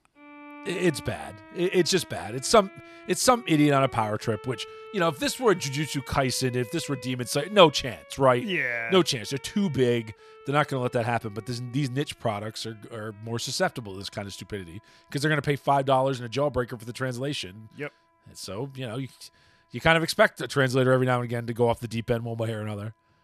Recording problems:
background music; faint; throughout; 20 dB below the speech

